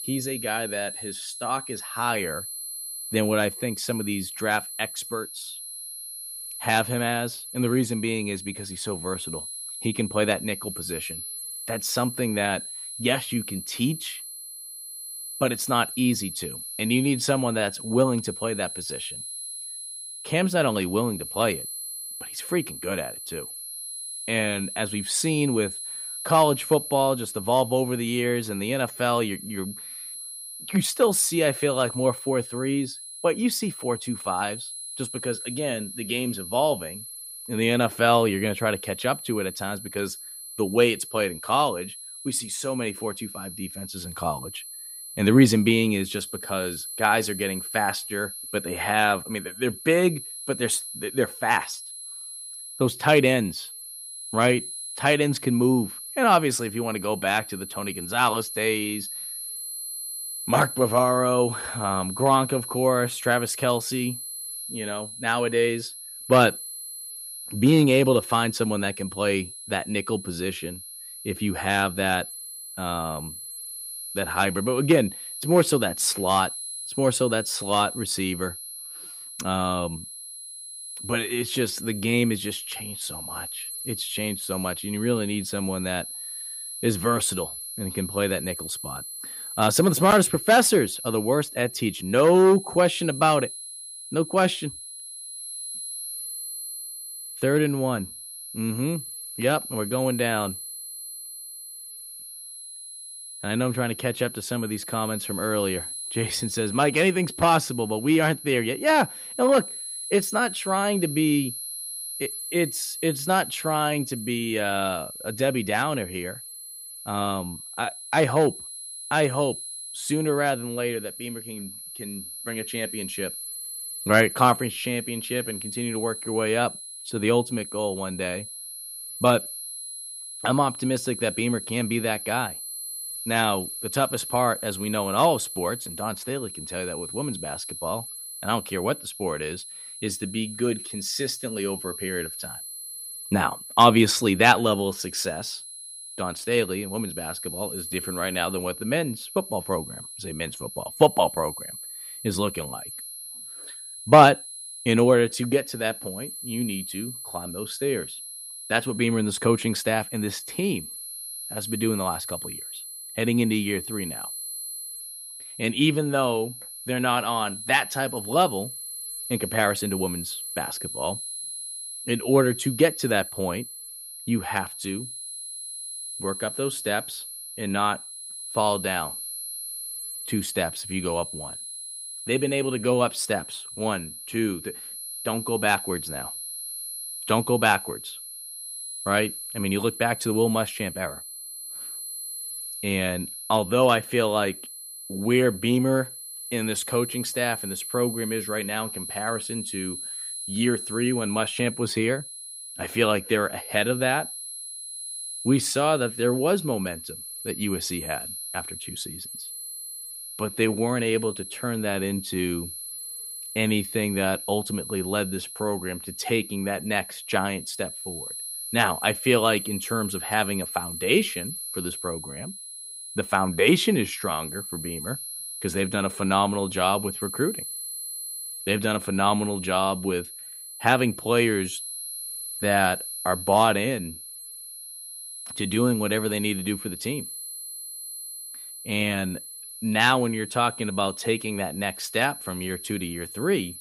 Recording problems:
high-pitched whine; loud; throughout; 10.5 kHz, 9 dB below the speech

